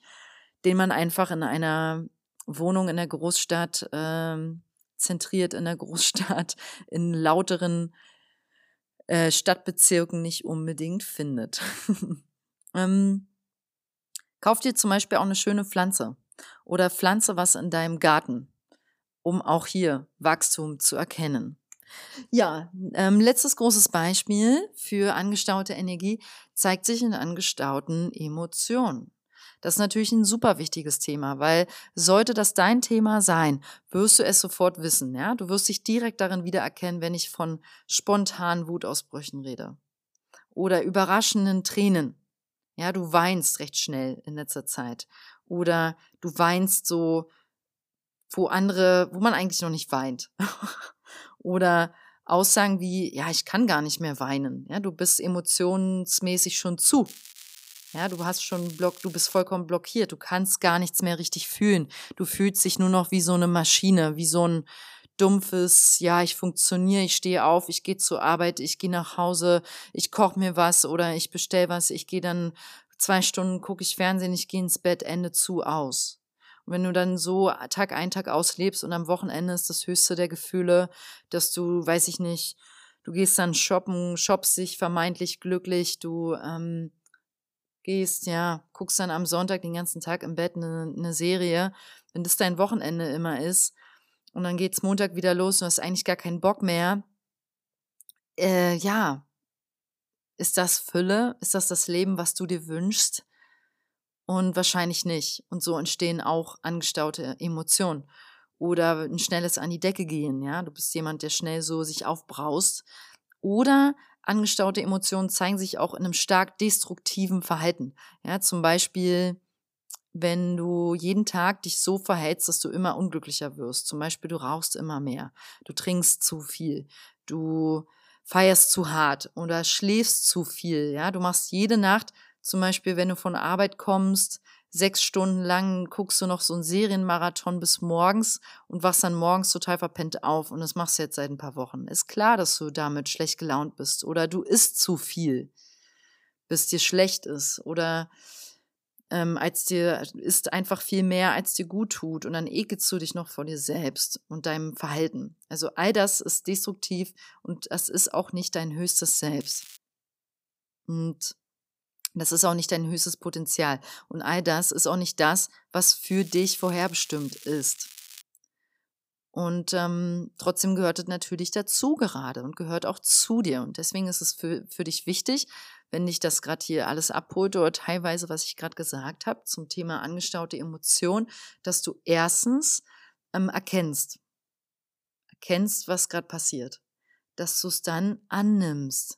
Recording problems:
crackling; noticeable; from 57 to 59 s, at 2:39 and from 2:46 to 2:48; 20 dB below the speech

